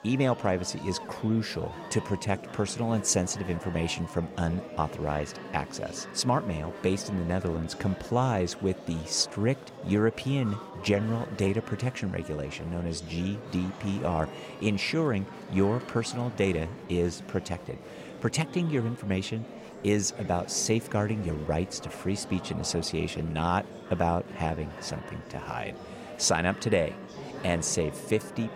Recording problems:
murmuring crowd; noticeable; throughout; 10 dB below the speech

